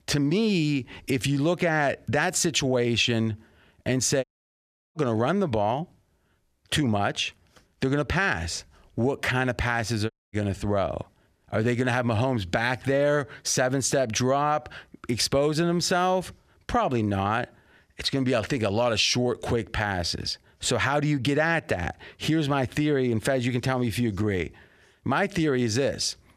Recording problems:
audio cutting out; at 4 s for 0.5 s and at 10 s

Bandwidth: 15 kHz